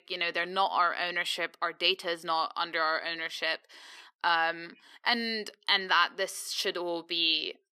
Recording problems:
thin; somewhat; fading below 350 Hz

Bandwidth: 13.5 kHz